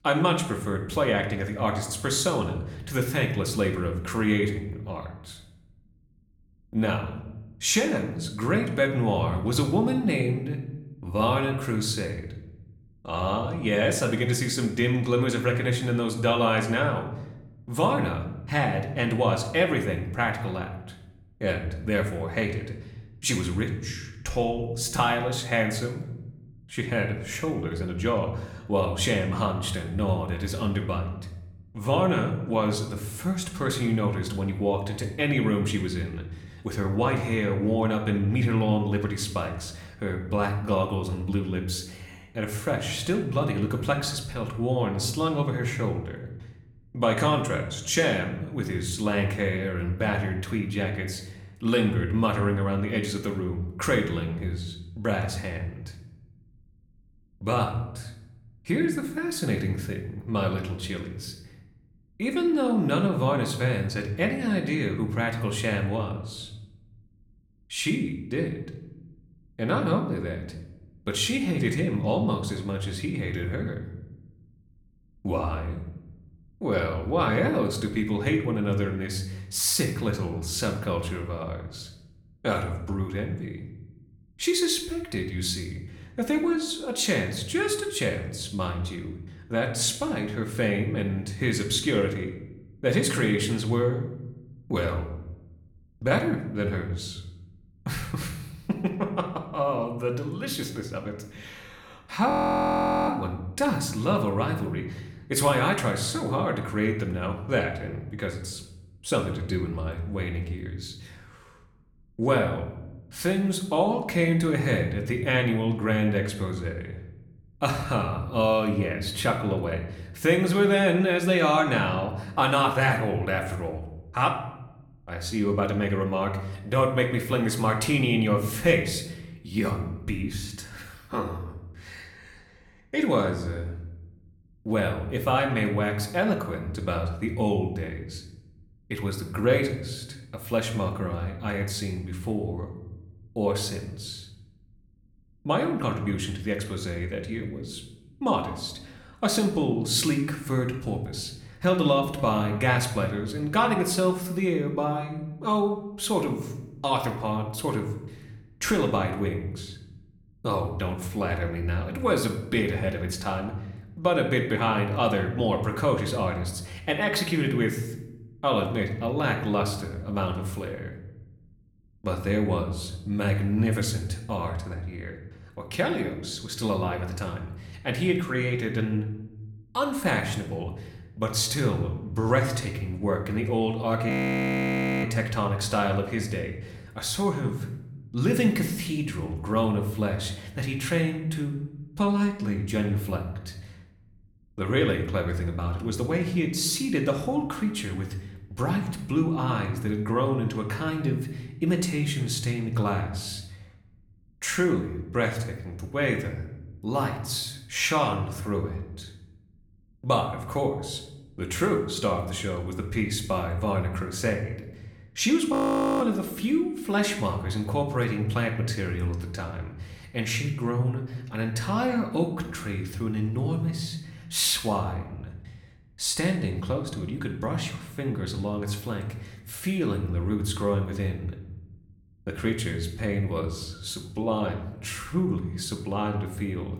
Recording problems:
room echo; slight; dies away in 0.7 s
off-mic speech; somewhat distant
audio freezing; at 1:42 for 1 s, at 3:04 for 1 s and at 3:36

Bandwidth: 18.5 kHz